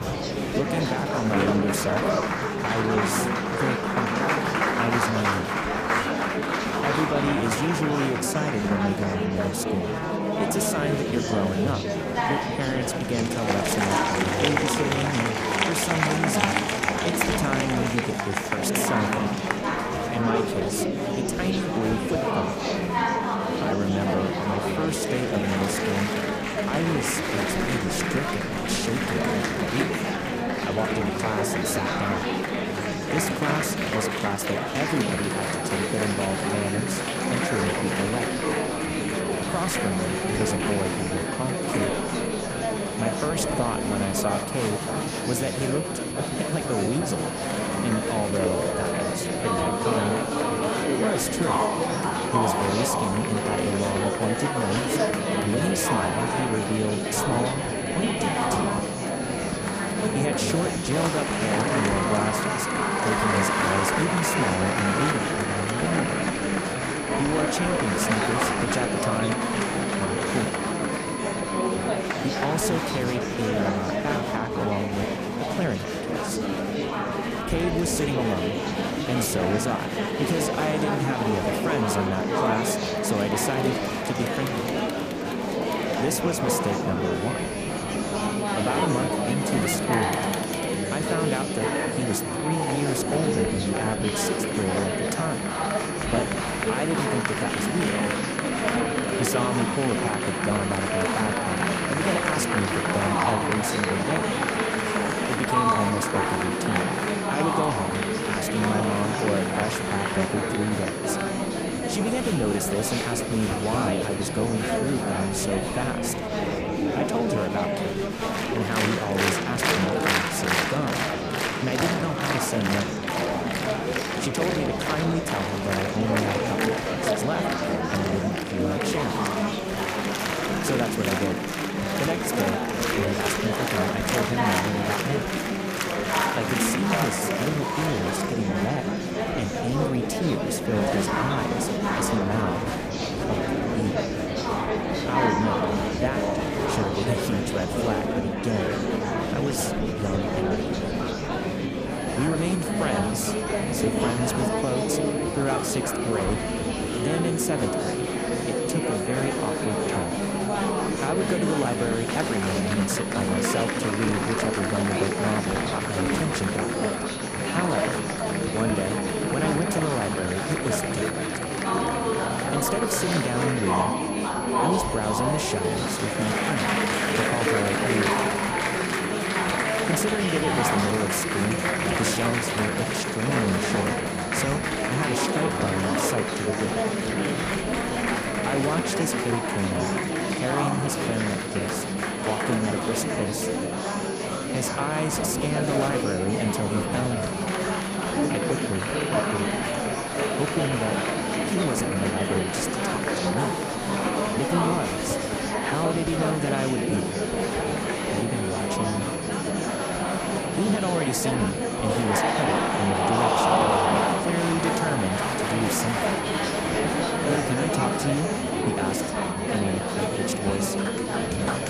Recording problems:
murmuring crowd; very loud; throughout; 3 dB above the speech
high-pitched whine; loud; from 35 s to 1:12, from 1:27 to 1:56 and from 2:32 on; 10.5 kHz, 9 dB below the speech
wind noise on the microphone; occasional gusts; 20 dB below the speech

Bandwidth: 14.5 kHz